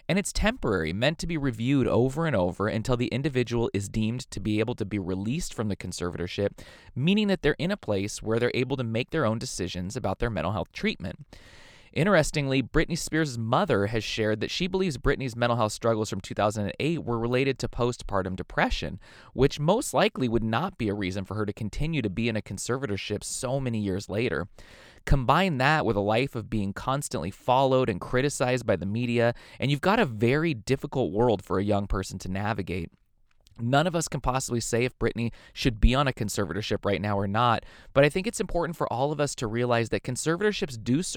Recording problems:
abrupt cut into speech; at the end

